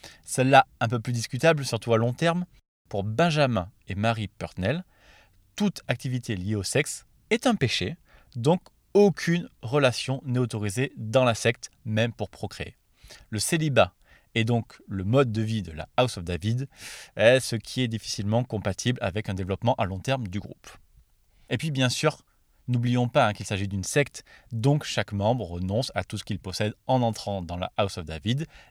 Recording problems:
none

